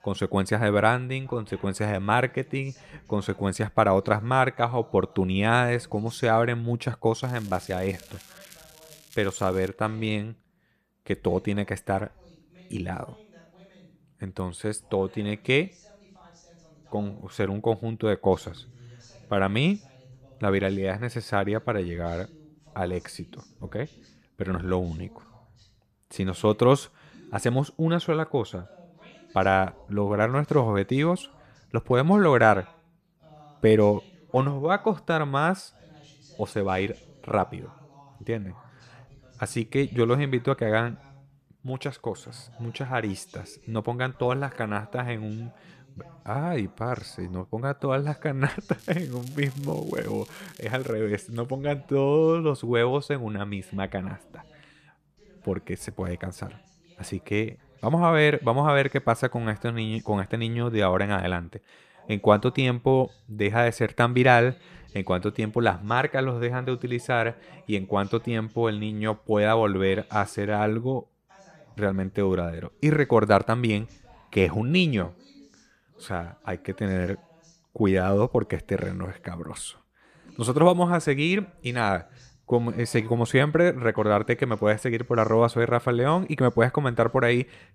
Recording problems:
voice in the background; faint; throughout; 30 dB below the speech
crackling; faint; from 7 to 9.5 s and from 49 to 51 s; 25 dB below the speech

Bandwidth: 14.5 kHz